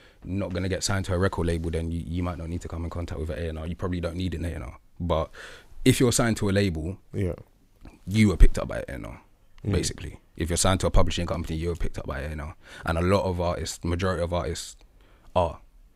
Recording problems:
none

